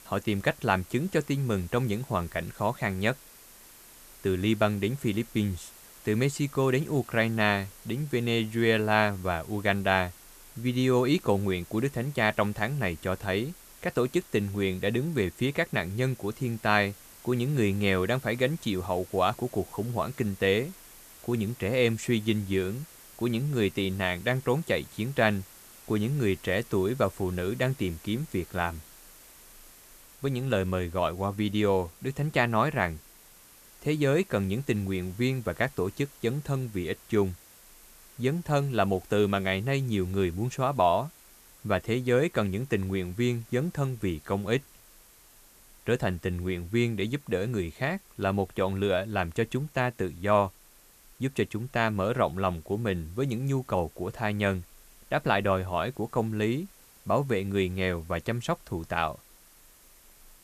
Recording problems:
hiss; faint; throughout; 20 dB below the speech

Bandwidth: 14.5 kHz